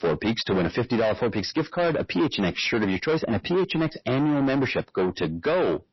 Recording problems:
distortion; heavy; 7 dB below the speech
garbled, watery; slightly; nothing above 5.5 kHz

